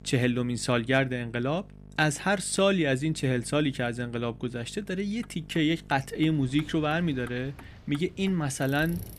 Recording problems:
electrical hum; faint; until 6.5 s; 50 Hz, 30 dB below the speech
traffic noise; faint; from 5 s on; 25 dB below the speech
rain or running water; faint; from 6.5 s on; 20 dB below the speech

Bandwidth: 15 kHz